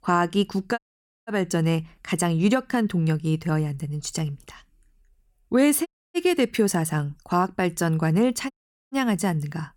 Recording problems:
audio cutting out; at 1 s, at 6 s and at 8.5 s

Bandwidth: 17.5 kHz